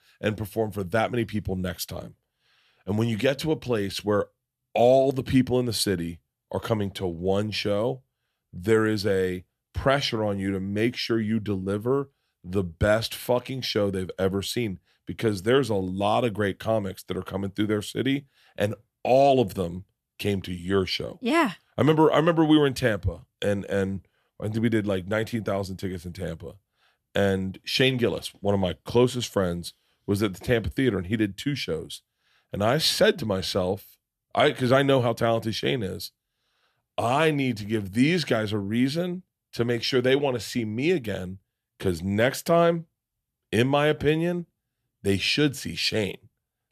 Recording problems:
none

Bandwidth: 14 kHz